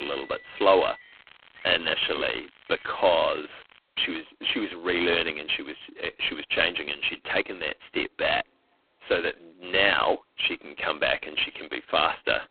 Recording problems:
phone-call audio; poor line
traffic noise; faint; throughout; 25 dB below the speech
crackling; faint; from 1 to 4 s; 25 dB below the speech
abrupt cut into speech; at the start

